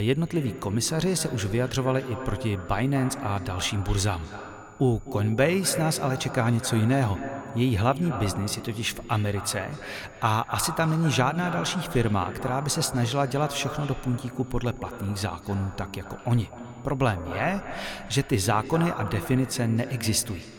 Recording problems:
echo of what is said; strong; throughout; 250 ms later, 10 dB below the speech
high-pitched whine; faint; throughout; 7 kHz, 35 dB below the speech
abrupt cut into speech; at the start

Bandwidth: 18 kHz